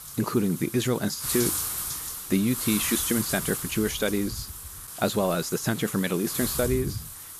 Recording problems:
wind noise on the microphone; heavy; 6 dB below the speech

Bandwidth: 14.5 kHz